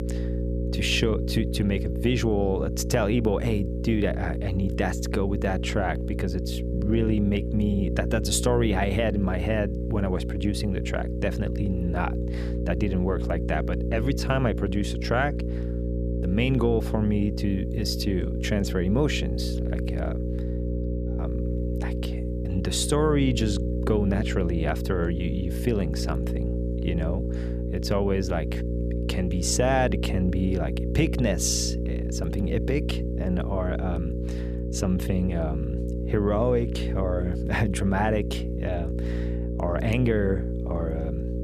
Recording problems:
electrical hum; loud; throughout; 60 Hz, 7 dB below the speech

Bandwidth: 14.5 kHz